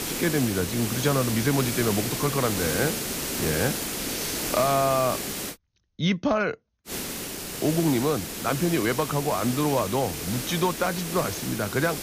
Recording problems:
high frequencies cut off; noticeable; nothing above 6.5 kHz
hiss; loud; until 5.5 s and from 7 s on; 4 dB below the speech

